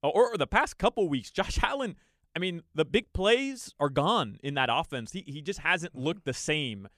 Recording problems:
none

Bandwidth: 14.5 kHz